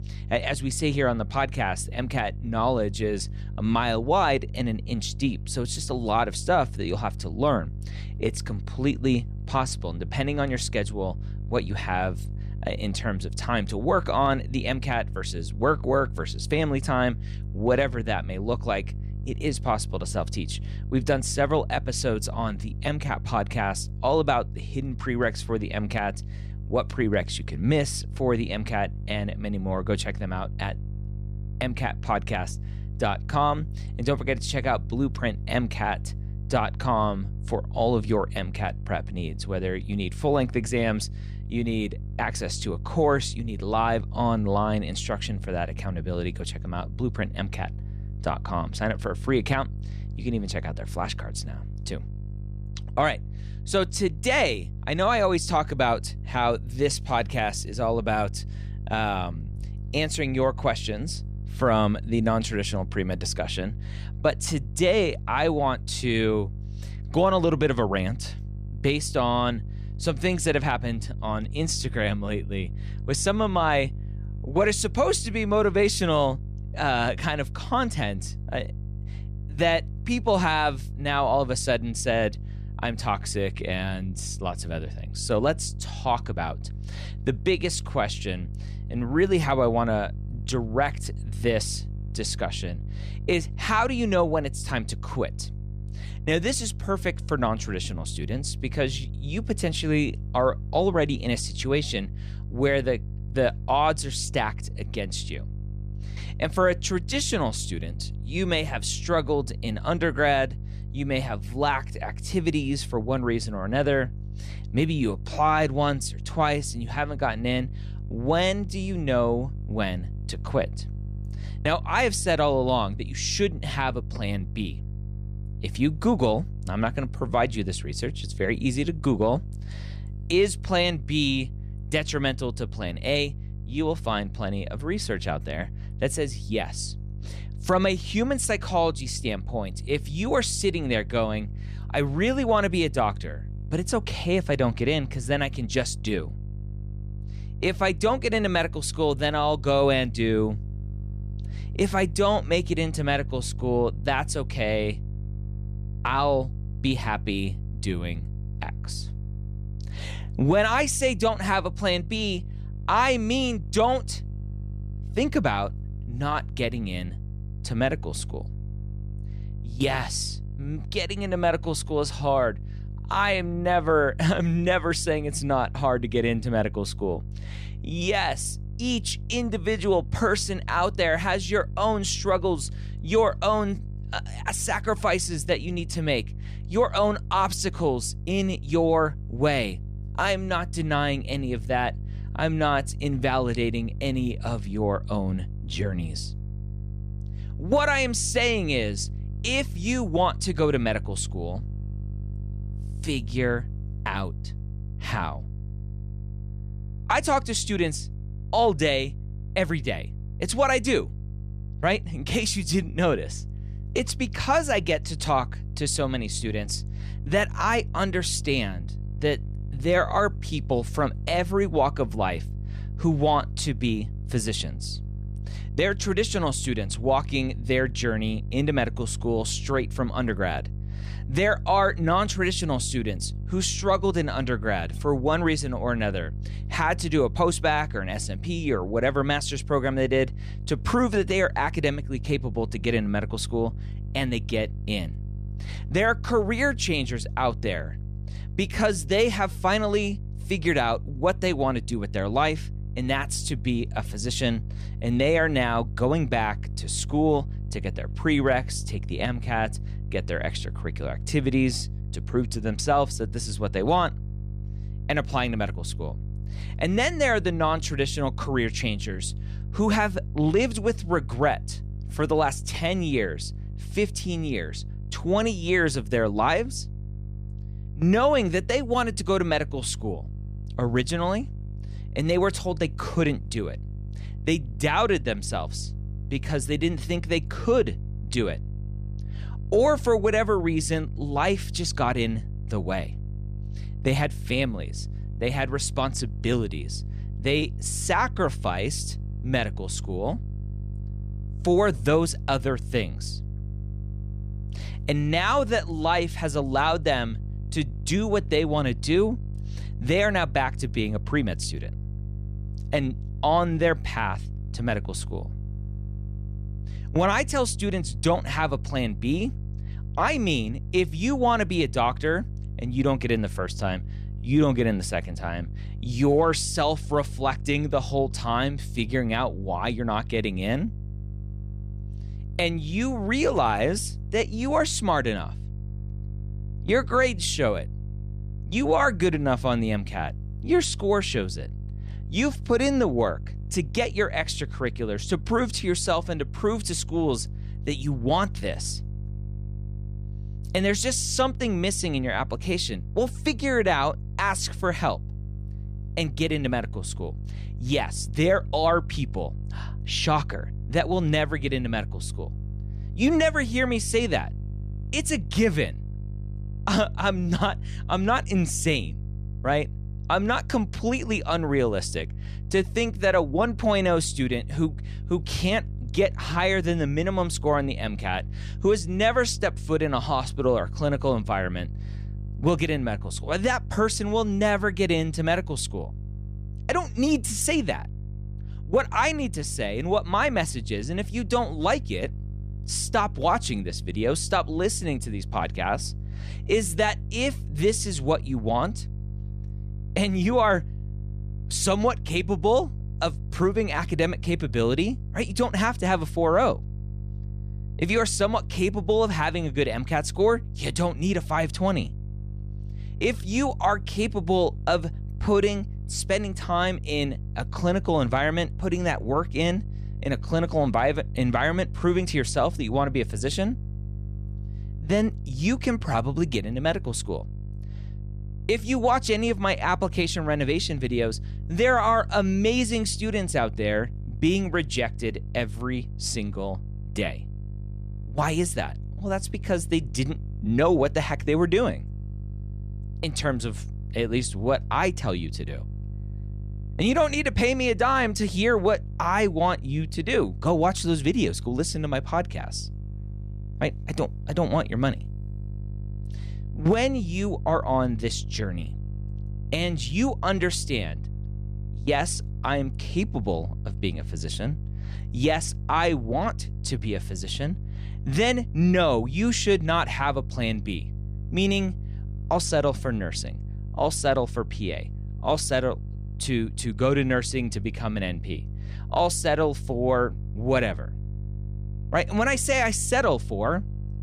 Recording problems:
electrical hum; faint; throughout; 50 Hz, 25 dB below the speech

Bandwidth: 14 kHz